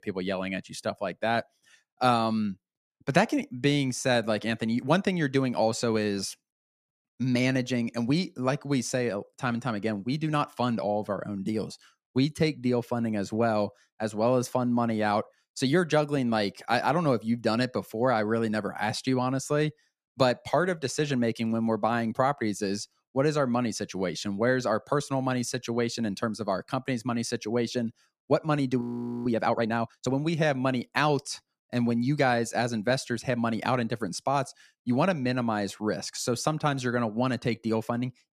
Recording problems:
audio freezing; at 29 s

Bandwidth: 14.5 kHz